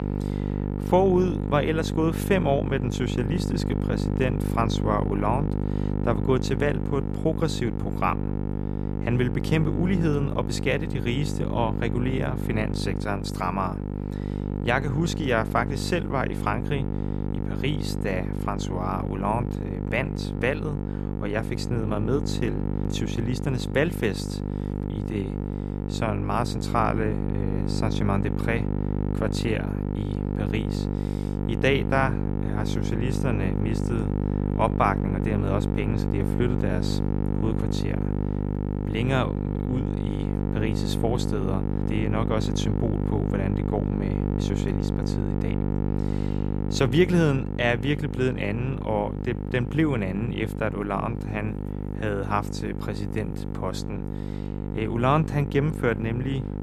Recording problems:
electrical hum; loud; throughout; 50 Hz, 6 dB below the speech

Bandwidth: 14.5 kHz